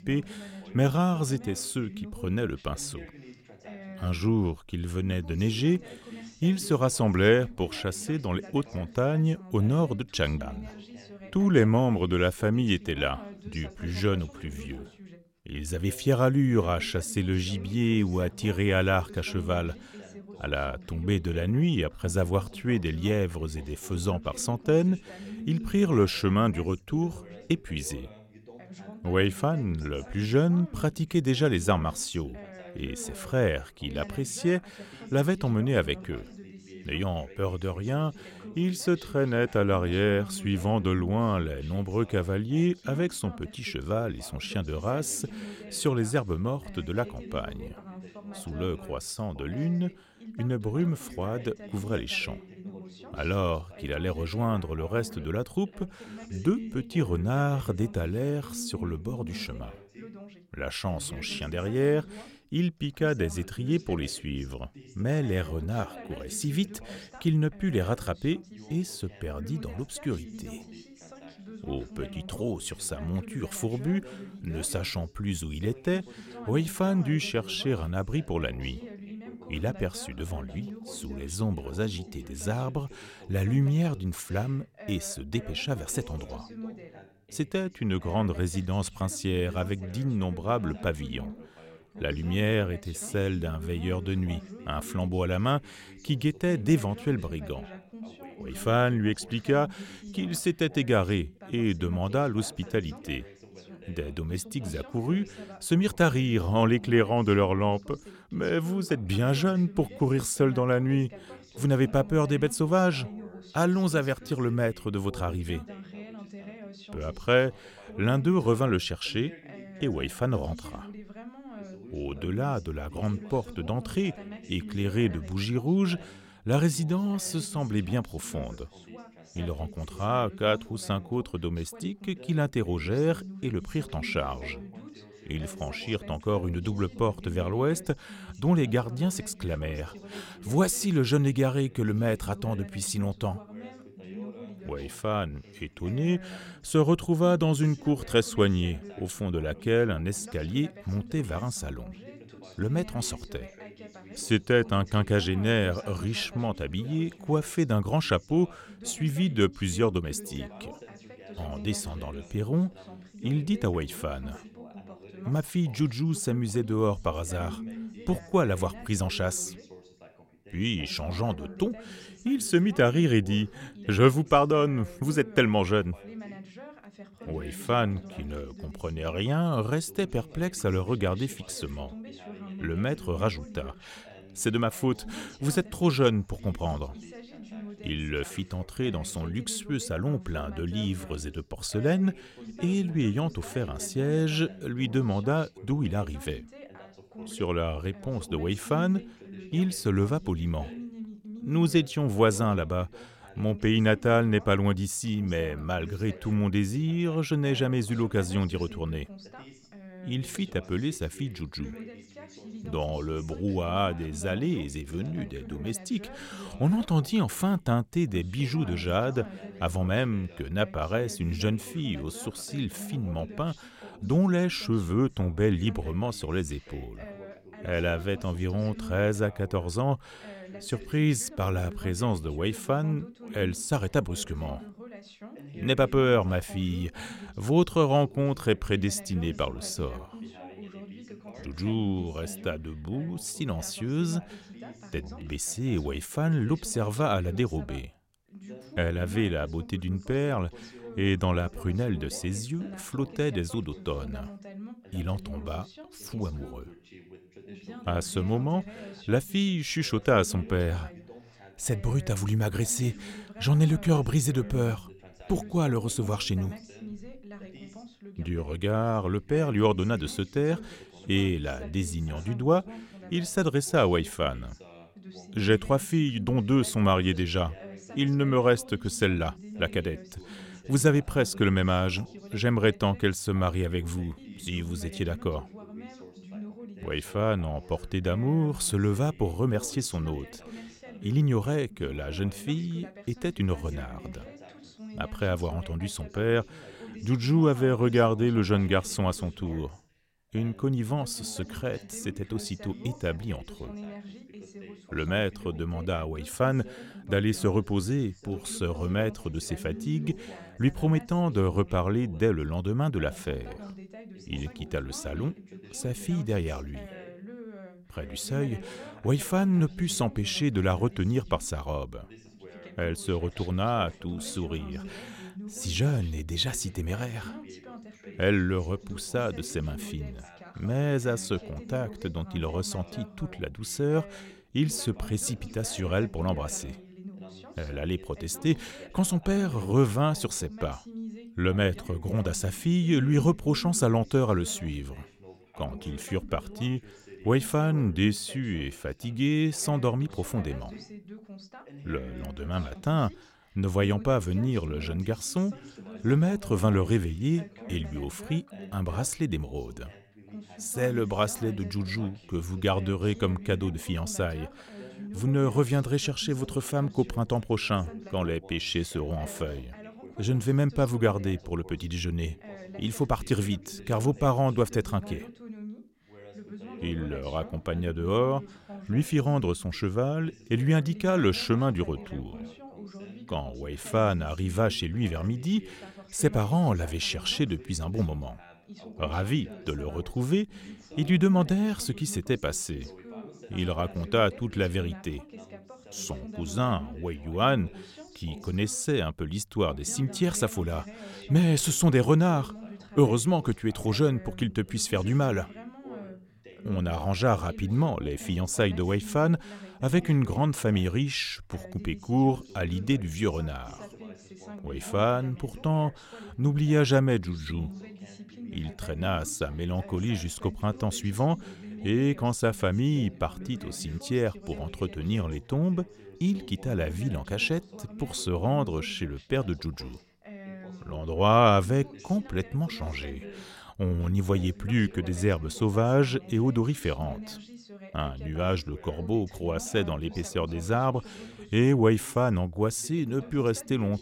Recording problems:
background chatter; noticeable; throughout; 2 voices, 15 dB below the speech

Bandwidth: 16.5 kHz